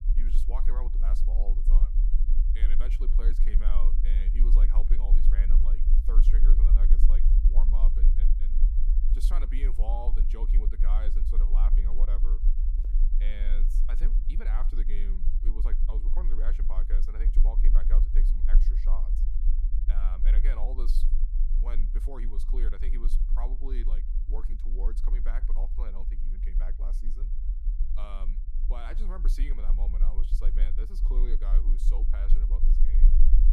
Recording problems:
low rumble; loud; throughout; 6 dB below the speech
footsteps; faint; at 13 s; peak 10 dB below the speech

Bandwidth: 15 kHz